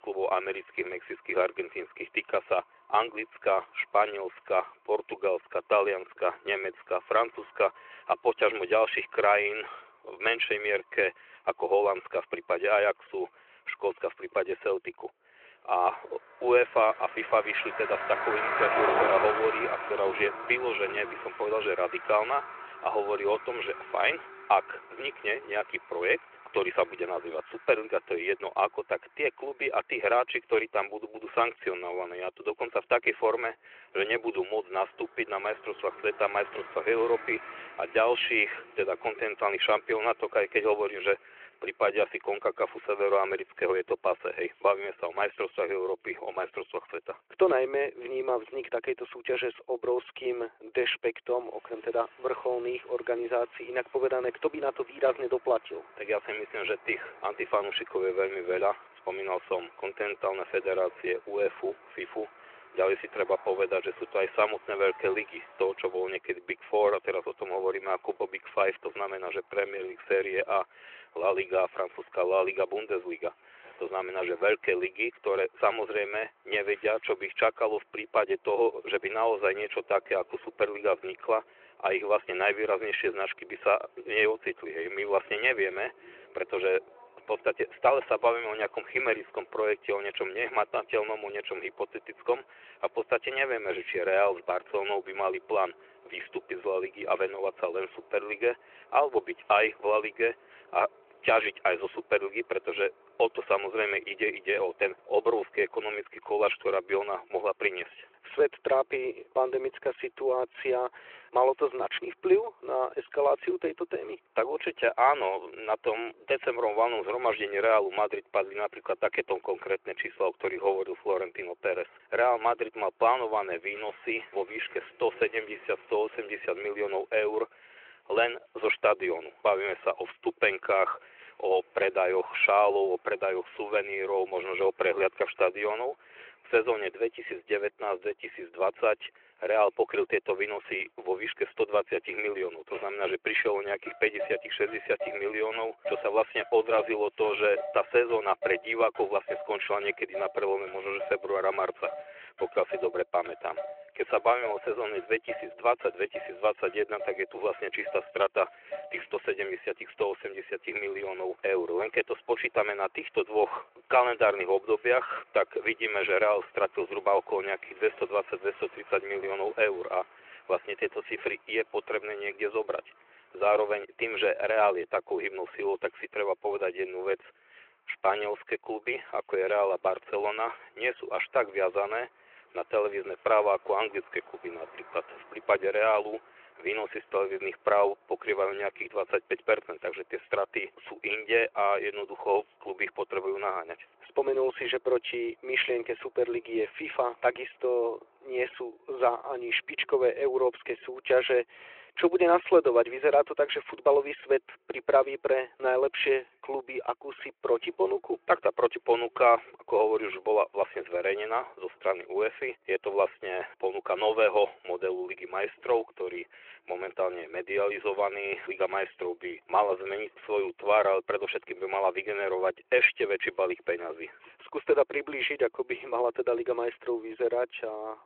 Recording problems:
muffled; very; fading above 3.5 kHz
thin; very; fading below 850 Hz
phone-call audio
traffic noise; noticeable; throughout; 10 dB below the speech

